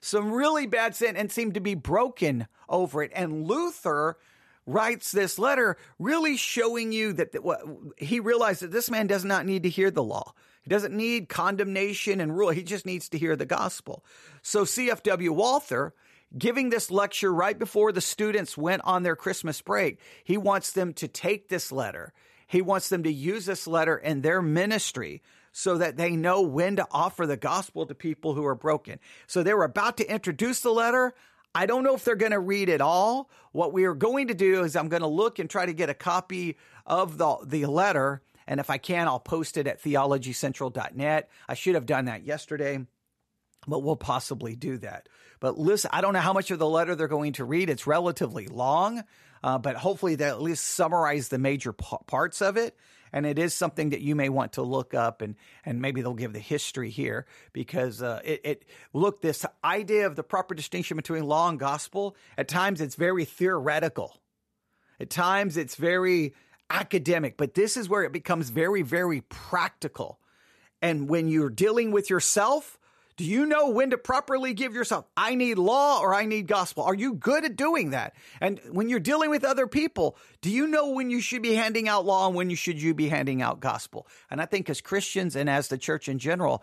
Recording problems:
none

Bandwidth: 13.5 kHz